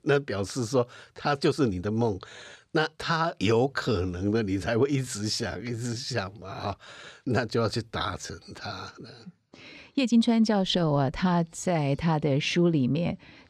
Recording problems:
uneven, jittery; strongly; from 1 to 12 s

